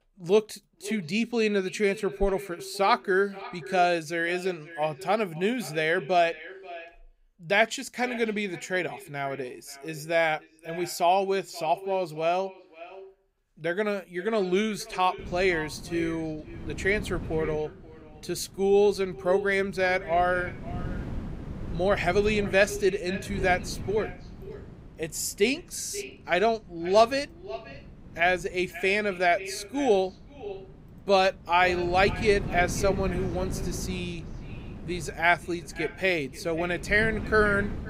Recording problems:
echo of what is said; noticeable; throughout; 530 ms later, 15 dB below the speech
wind noise on the microphone; occasional gusts; from 15 s on; 20 dB below the speech

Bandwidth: 15.5 kHz